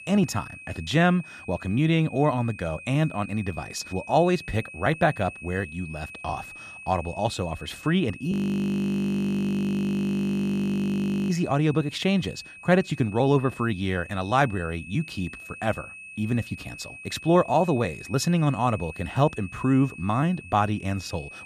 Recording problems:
high-pitched whine; noticeable; throughout; 2.5 kHz, 15 dB below the speech
audio freezing; at 8.5 s for 3 s

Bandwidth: 14.5 kHz